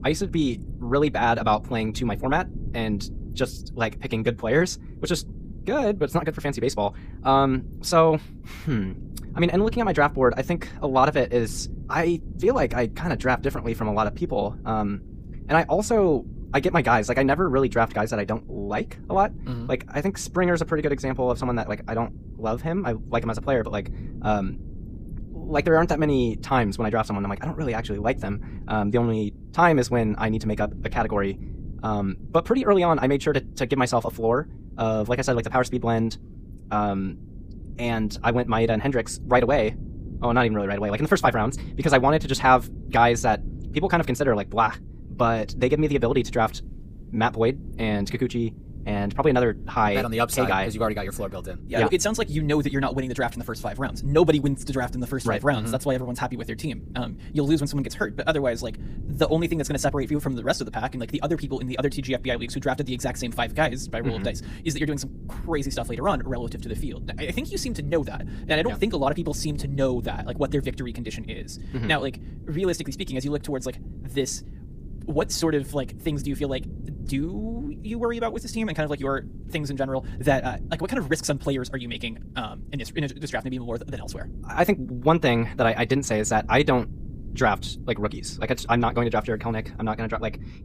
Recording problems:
wrong speed, natural pitch; too fast; 1.6 times normal speed
low rumble; faint; throughout; 25 dB below the speech

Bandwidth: 15 kHz